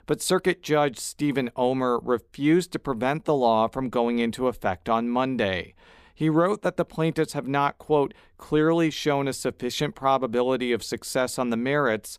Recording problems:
none

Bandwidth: 15 kHz